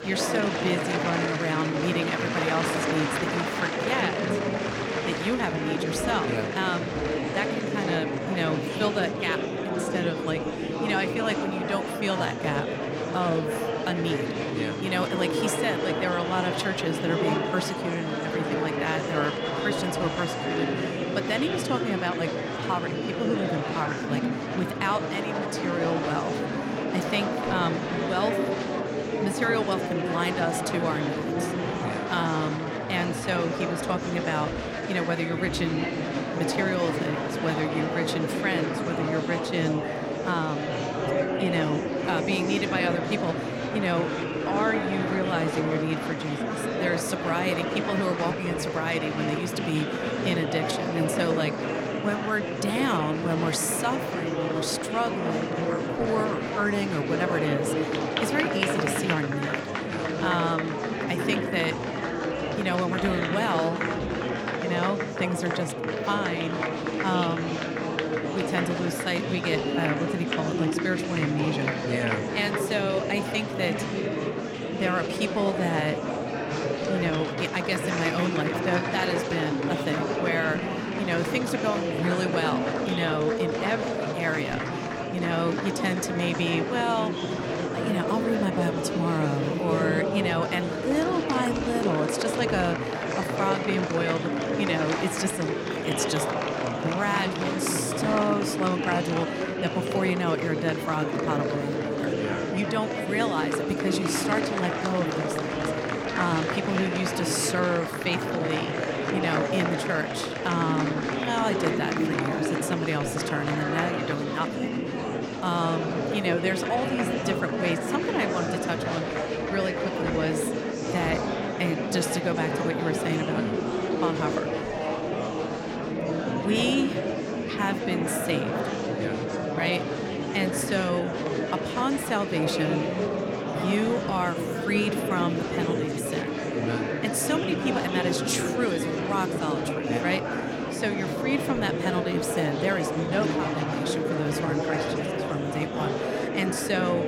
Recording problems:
murmuring crowd; very loud; throughout; 1 dB above the speech

